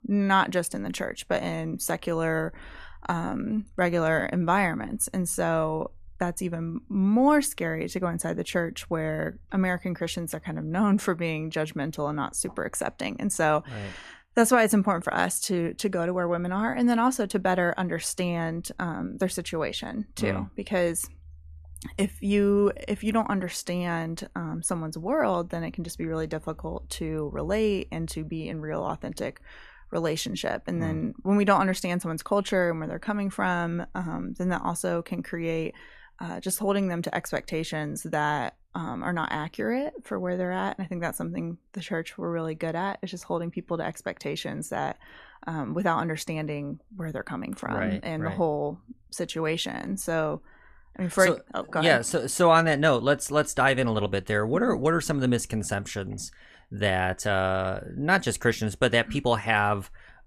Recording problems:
none

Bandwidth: 14 kHz